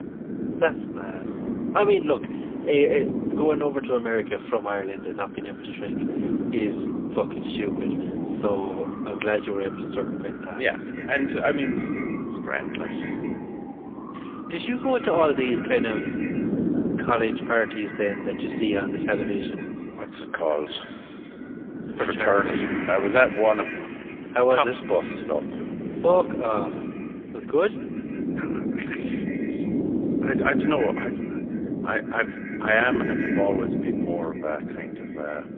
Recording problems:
phone-call audio; poor line; nothing above 3.5 kHz
echo of what is said; noticeable; from 11 s on; 160 ms later, 15 dB below the speech
wind noise on the microphone; heavy; 9 dB below the speech
traffic noise; noticeable; throughout; 15 dB below the speech

